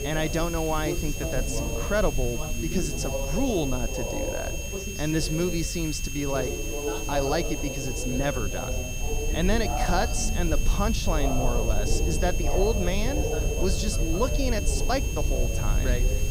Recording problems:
high-pitched whine; loud; throughout; 2.5 kHz, 6 dB below the speech
background chatter; loud; throughout; 2 voices, 5 dB below the speech
hiss; noticeable; throughout; 15 dB below the speech
low rumble; noticeable; throughout; 15 dB below the speech

